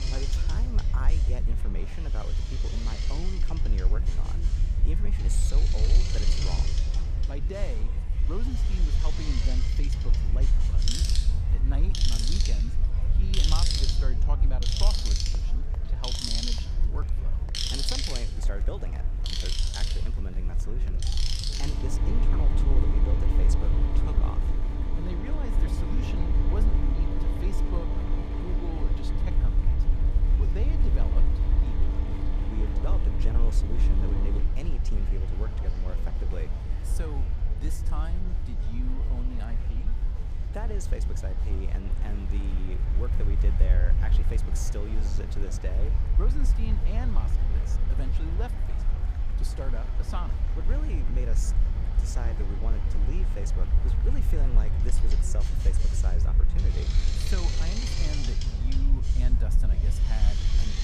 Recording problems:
machinery noise; very loud; throughout; 3 dB above the speech
murmuring crowd; loud; throughout; 9 dB below the speech
low rumble; loud; throughout; 6 dB below the speech

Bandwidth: 15 kHz